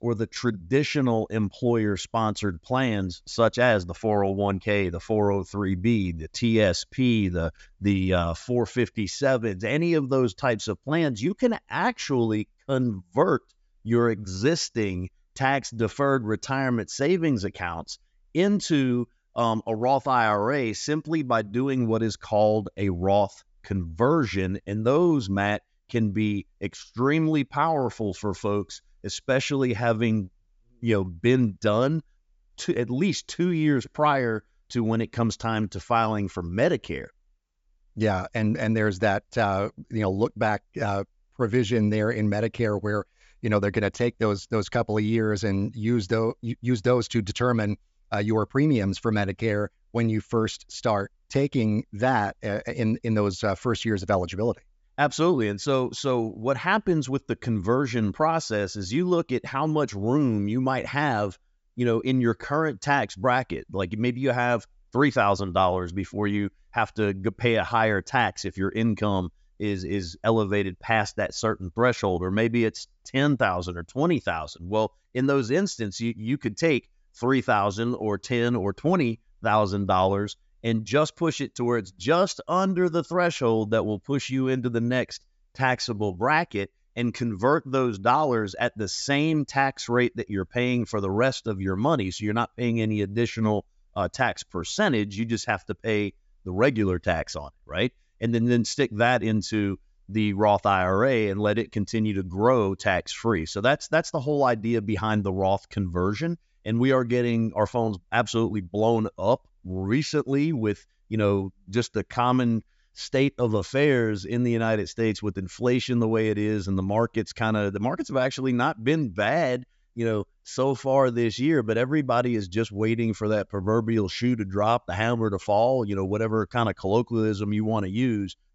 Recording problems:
high frequencies cut off; noticeable; nothing above 8 kHz

